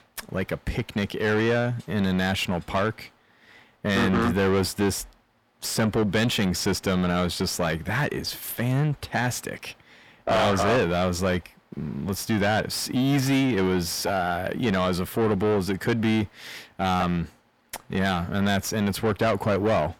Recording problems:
distortion; heavy; 7 dB below the speech

